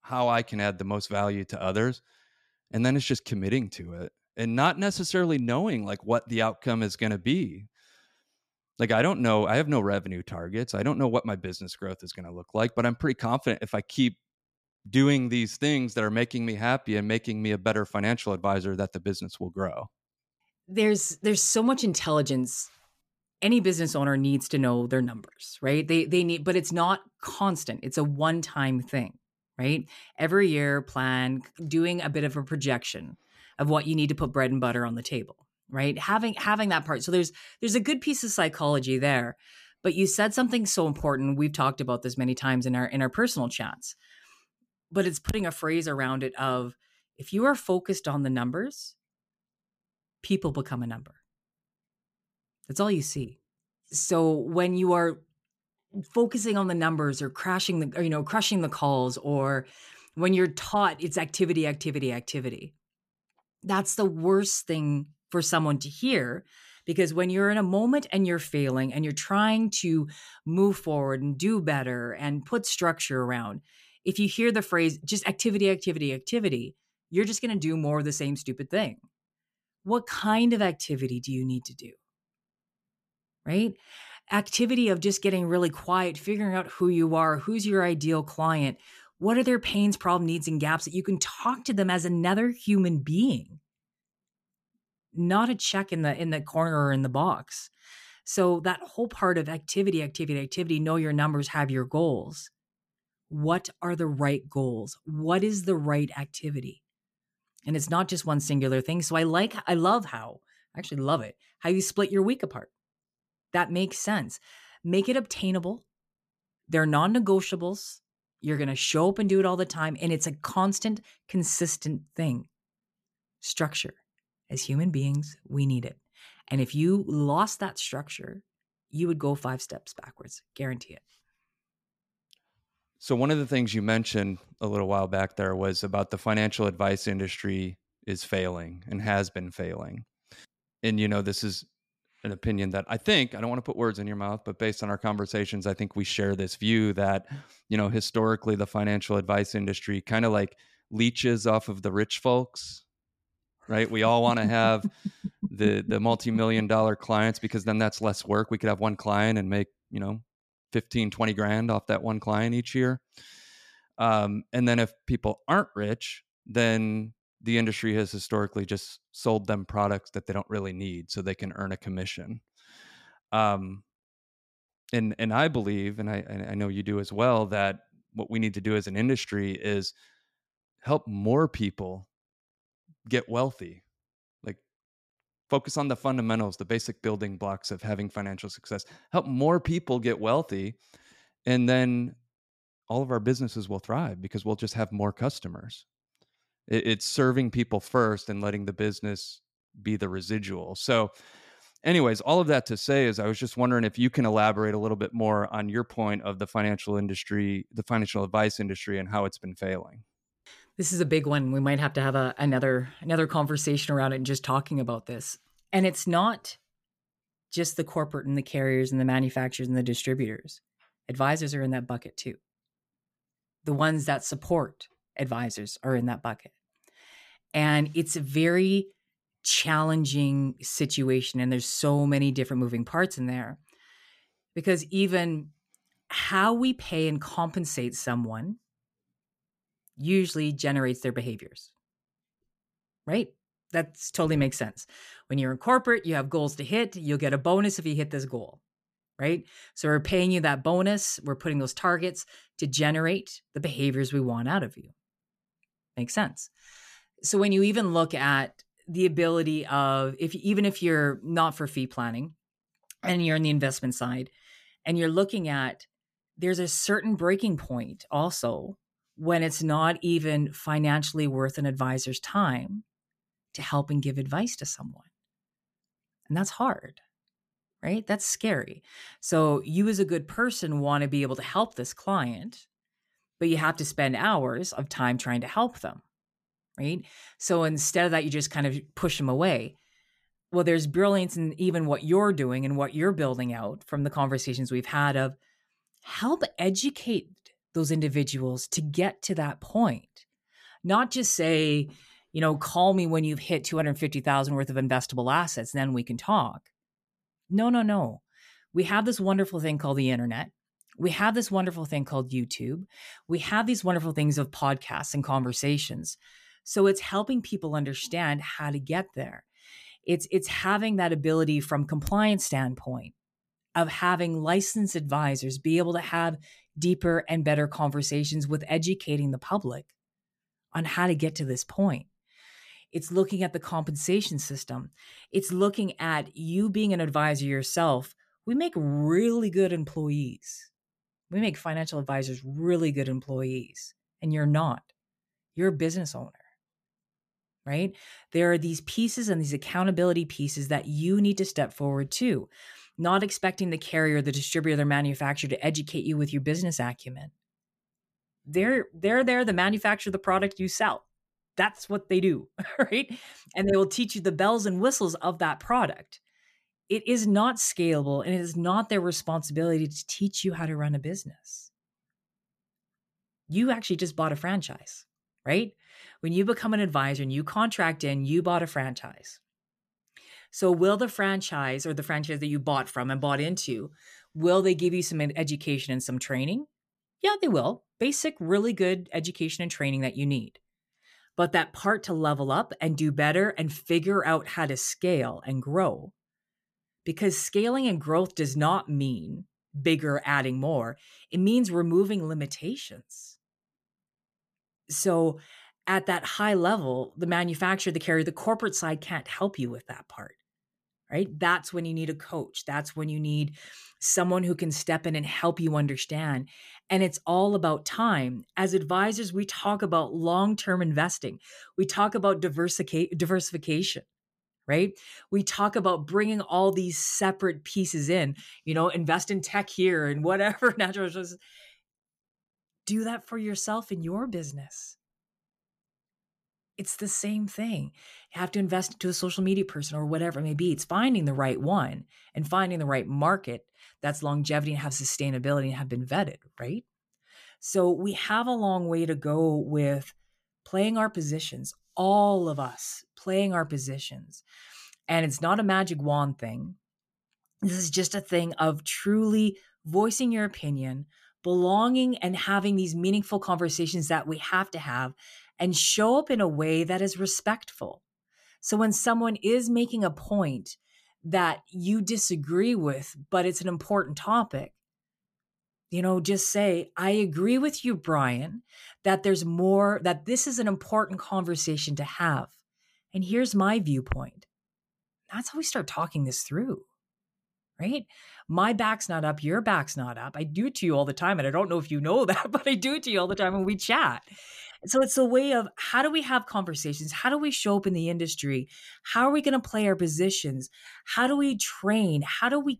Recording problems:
none

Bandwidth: 14.5 kHz